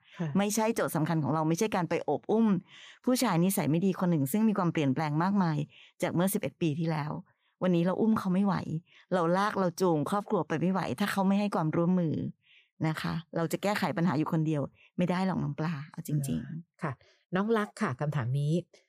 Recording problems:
none

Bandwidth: 15 kHz